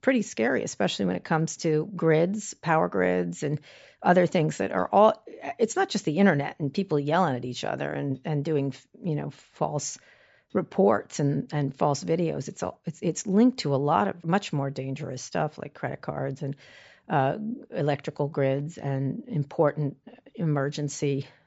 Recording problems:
high frequencies cut off; noticeable; nothing above 8 kHz

